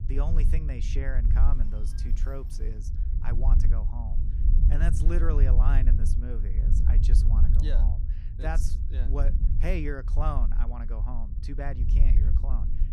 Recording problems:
low rumble; loud; throughout; 6 dB below the speech
phone ringing; noticeable; from 1.5 to 2.5 s; peak 1 dB below the speech

